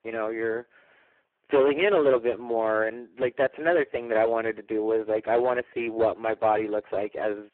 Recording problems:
phone-call audio; poor line
distortion; slight; 4% of the sound clipped

